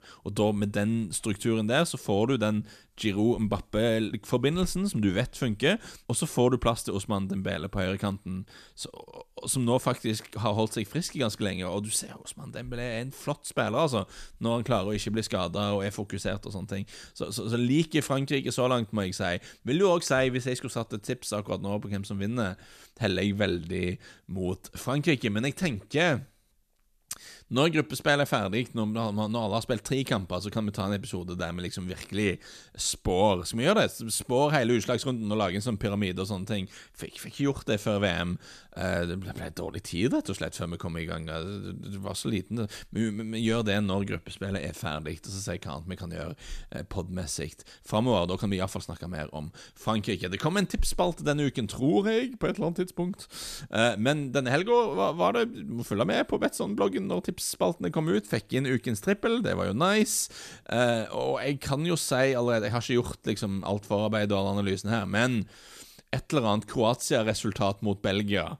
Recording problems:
none

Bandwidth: 14.5 kHz